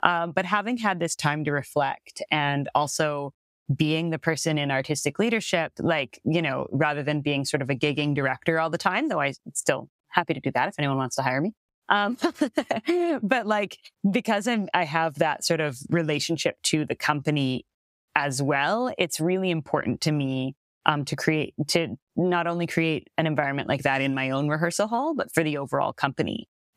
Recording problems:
squashed, flat; somewhat

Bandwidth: 15.5 kHz